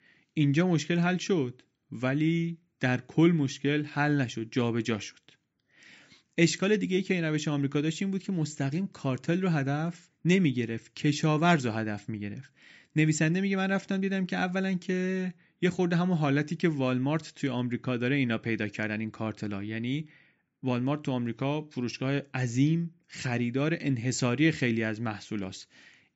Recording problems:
high frequencies cut off; noticeable; nothing above 8 kHz

